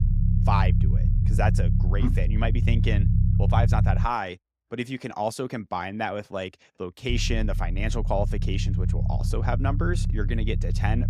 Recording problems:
low rumble; loud; until 4 s and from 7 s on; 9 dB below the speech

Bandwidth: 15.5 kHz